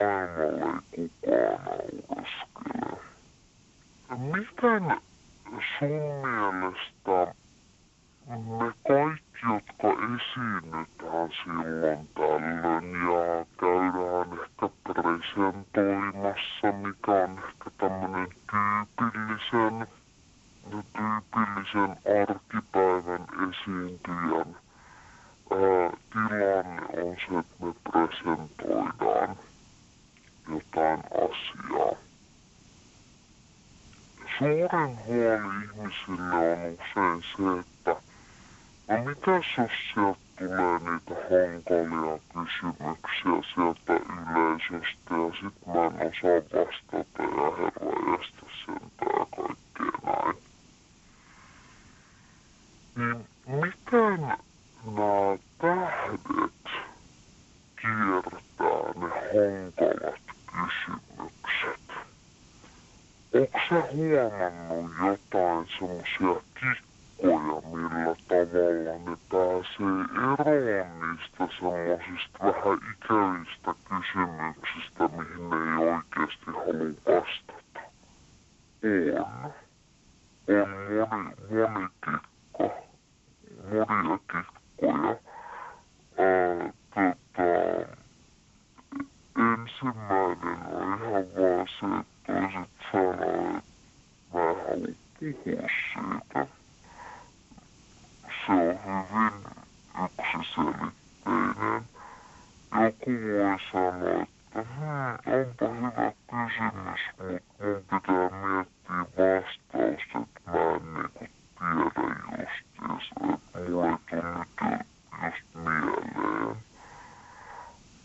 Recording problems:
wrong speed and pitch; too slow and too low; 0.5 times normal speed
phone-call audio
hiss; faint; throughout; 30 dB below the speech
abrupt cut into speech; at the start

